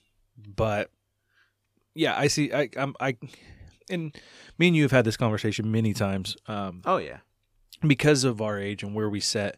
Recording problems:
none

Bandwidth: 15 kHz